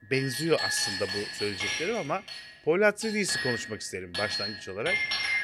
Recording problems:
household noises; loud; throughout; 1 dB below the speech

